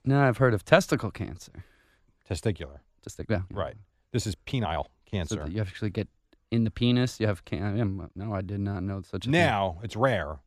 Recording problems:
uneven, jittery; strongly; from 3 to 9 s

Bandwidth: 14.5 kHz